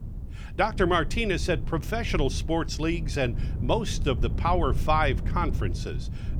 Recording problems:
wind noise on the microphone; occasional gusts; 20 dB below the speech

